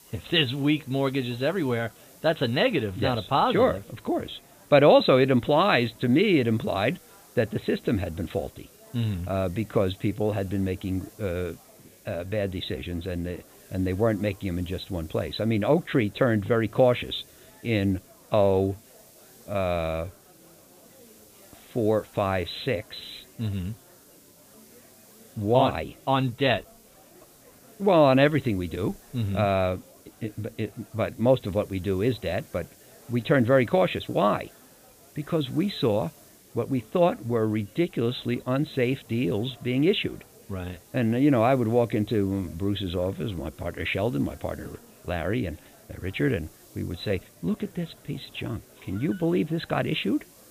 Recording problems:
high frequencies cut off; severe; nothing above 4 kHz
murmuring crowd; faint; throughout; 30 dB below the speech
hiss; faint; throughout; 25 dB below the speech

